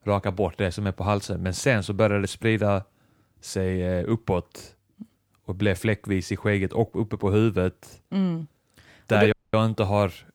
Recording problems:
audio cutting out; at 9.5 s

